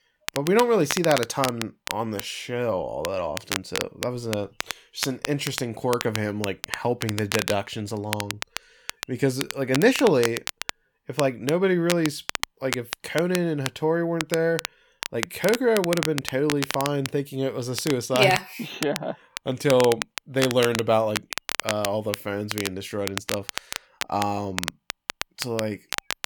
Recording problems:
crackle, like an old record; loud; 7 dB below the speech

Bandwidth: 18.5 kHz